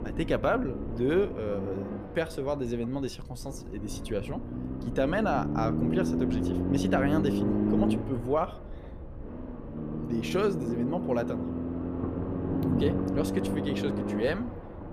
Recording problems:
low rumble; loud; throughout; 4 dB below the speech

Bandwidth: 14.5 kHz